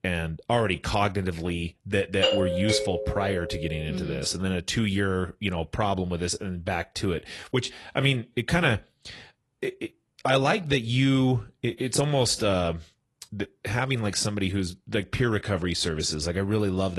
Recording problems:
garbled, watery; slightly; nothing above 11 kHz
doorbell; loud; from 2 to 3.5 s; peak 2 dB above the speech
abrupt cut into speech; at the end

